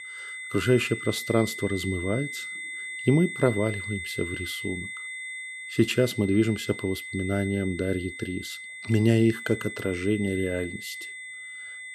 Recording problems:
high-pitched whine; loud; throughout; 2 kHz, 8 dB below the speech

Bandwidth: 14 kHz